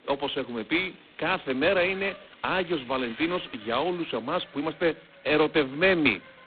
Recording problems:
phone-call audio; poor line; nothing above 4 kHz
traffic noise; faint; throughout; 20 dB below the speech

